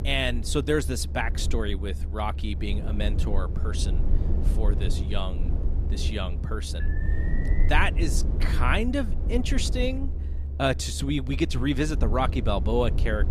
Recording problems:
low rumble; noticeable; throughout; 15 dB below the speech
alarm; faint; at 7 s; peak 10 dB below the speech

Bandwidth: 14.5 kHz